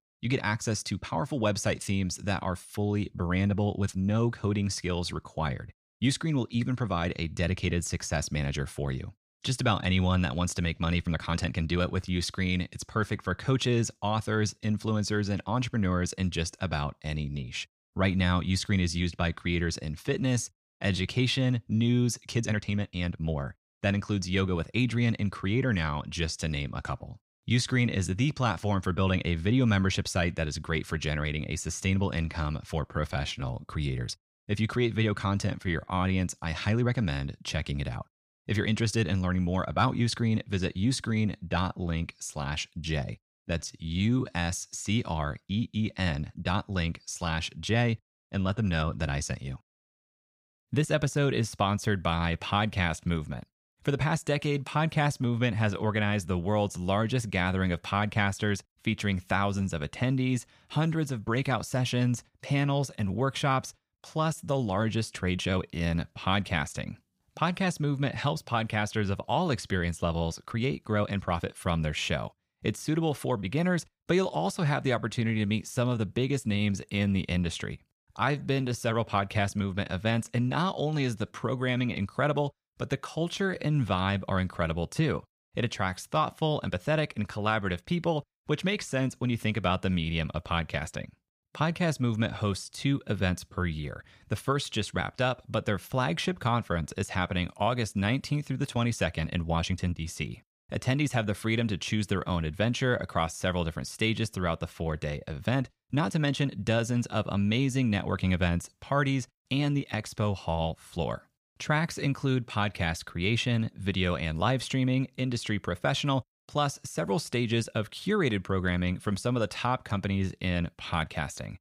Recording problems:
uneven, jittery; strongly; from 11 s to 1:47

